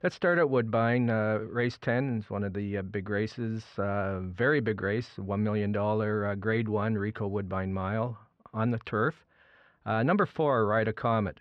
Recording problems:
muffled; slightly; fading above 2.5 kHz

